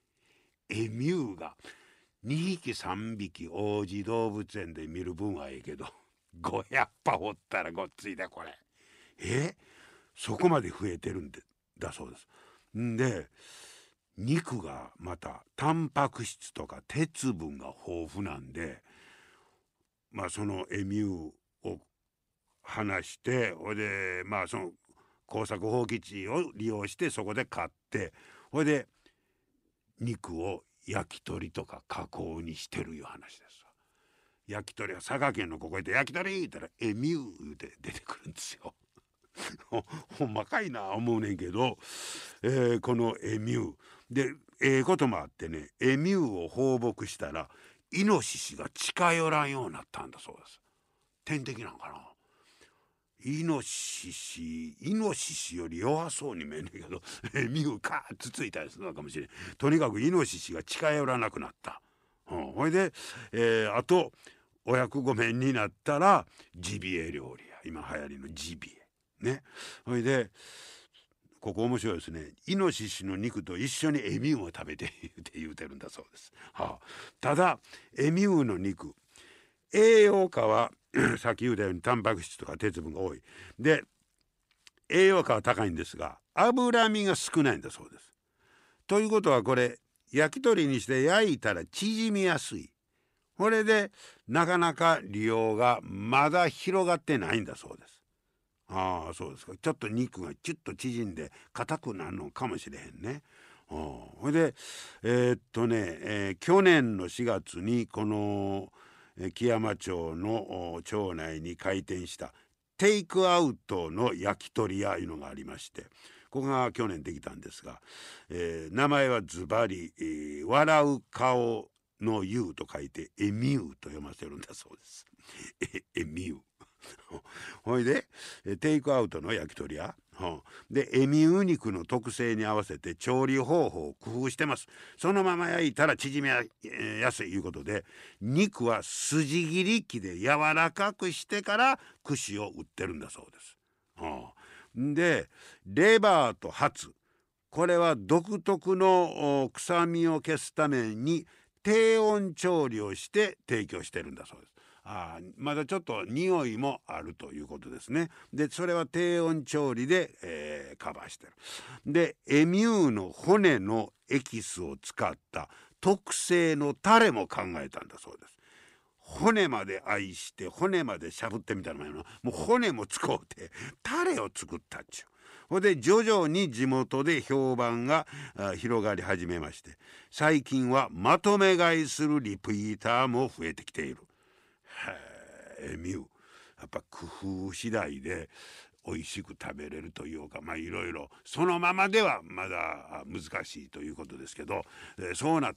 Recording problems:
none

